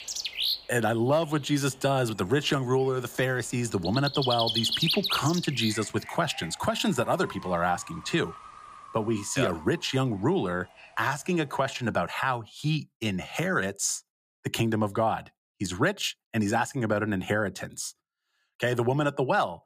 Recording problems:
animal sounds; loud; until 12 s; 2 dB below the speech

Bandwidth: 15 kHz